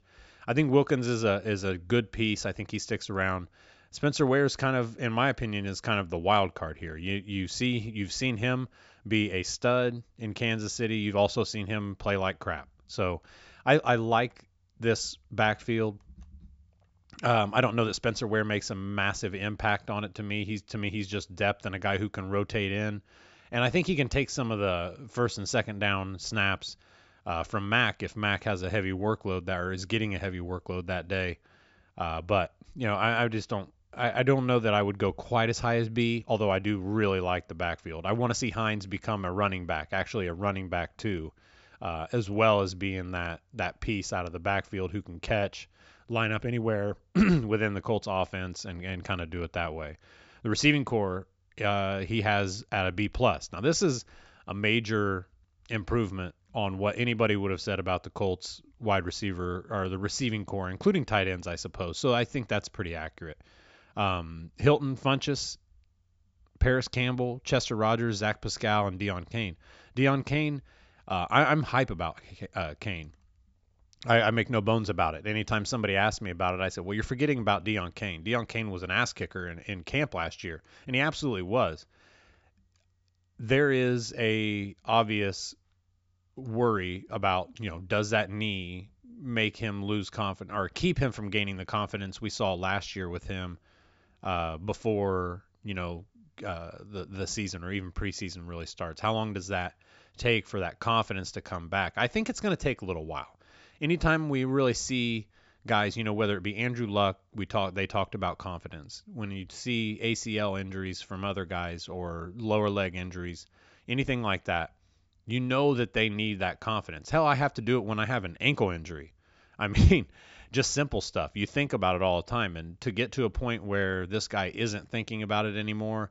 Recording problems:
high frequencies cut off; noticeable; nothing above 8 kHz

